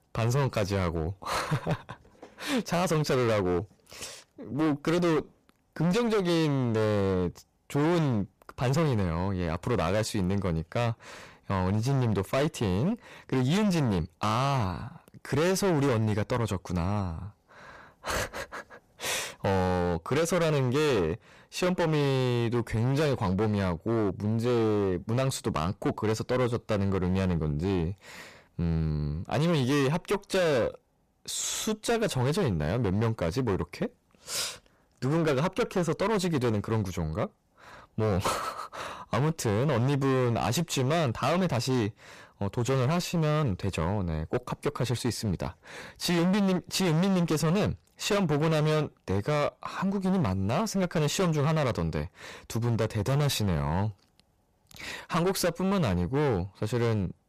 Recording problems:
distortion; heavy; 21% of the sound clipped

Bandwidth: 14.5 kHz